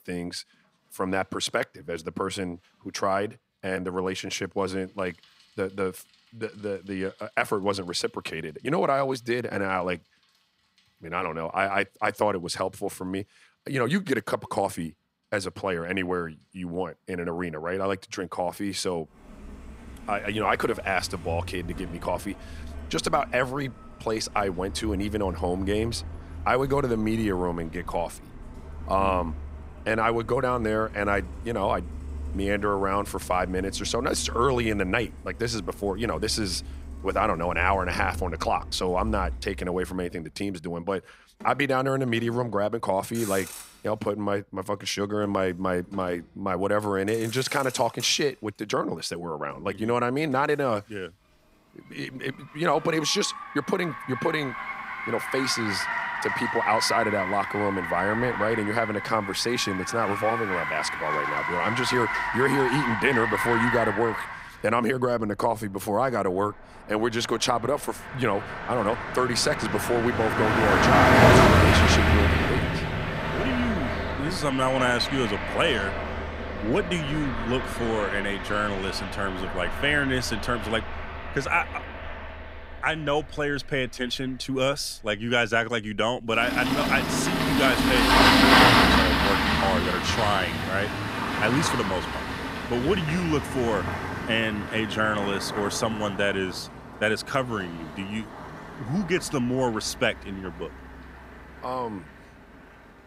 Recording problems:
traffic noise; very loud; throughout; 1 dB above the speech

